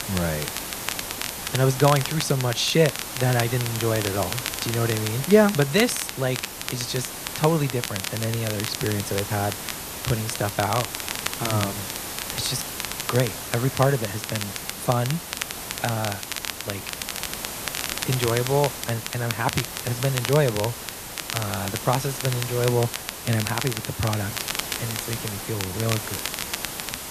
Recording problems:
hiss; loud; throughout; 7 dB below the speech
crackle, like an old record; loud; 7 dB below the speech

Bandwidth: 14.5 kHz